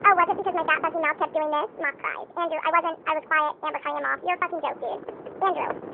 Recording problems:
wrong speed and pitch; too fast and too high; 1.6 times normal speed
phone-call audio; nothing above 3.5 kHz
muffled; very slightly; fading above 2.5 kHz
wind noise on the microphone; occasional gusts; 20 dB below the speech
keyboard typing; faint; from 4.5 s on; peak 10 dB below the speech

